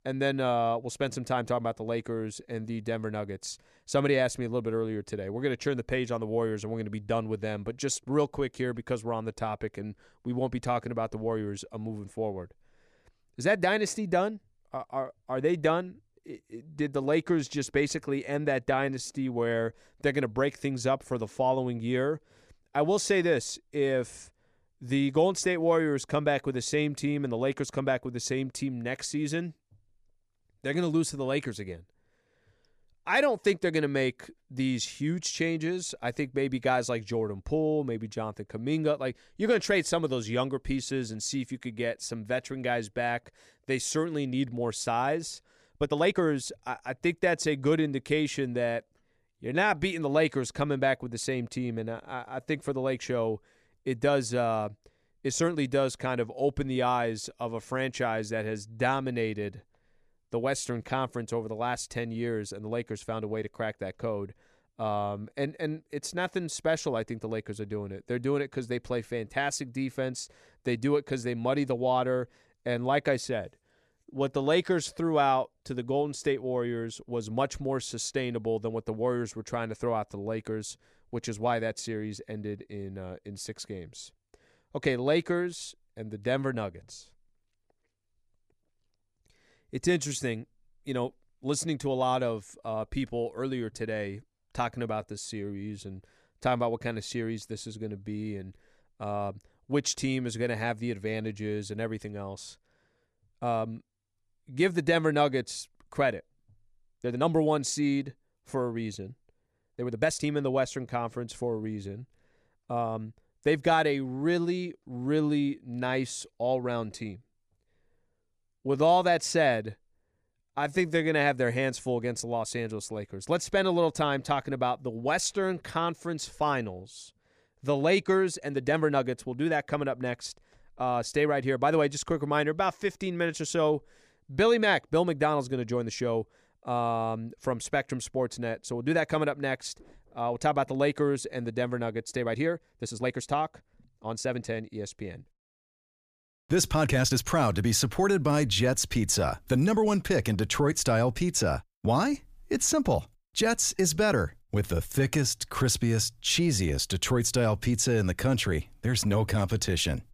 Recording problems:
uneven, jittery; strongly; from 19 s to 2:35

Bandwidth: 15 kHz